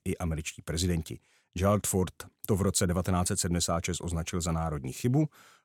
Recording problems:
none

